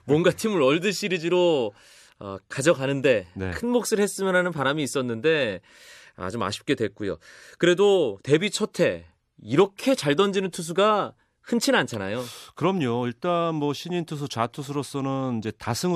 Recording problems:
abrupt cut into speech; at the end

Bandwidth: 13.5 kHz